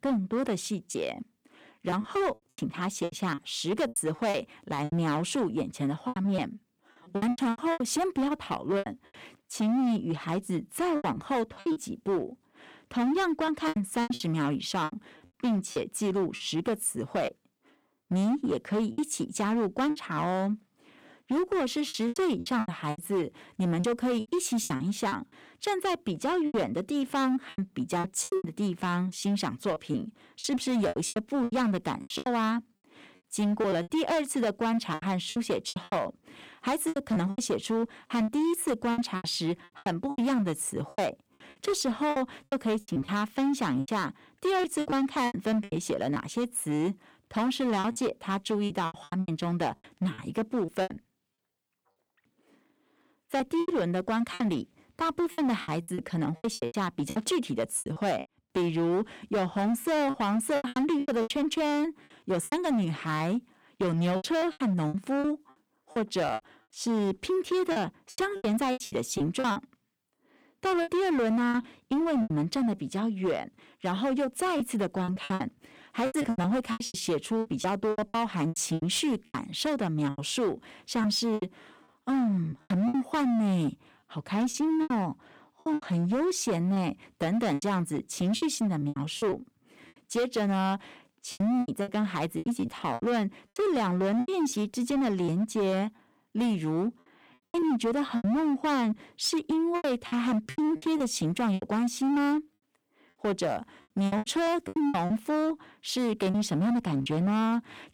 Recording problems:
distortion; slight; 15% of the sound clipped
choppy; very; 13% of the speech affected

